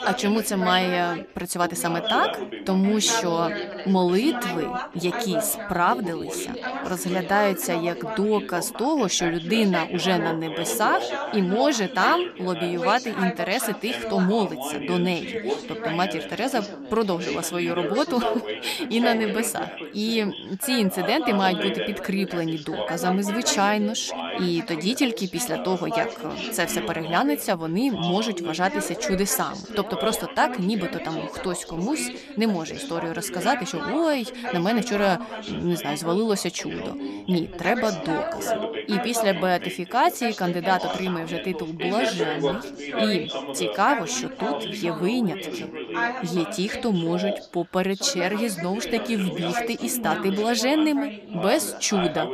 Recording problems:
background chatter; loud; throughout; 3 voices, 6 dB below the speech

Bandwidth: 14.5 kHz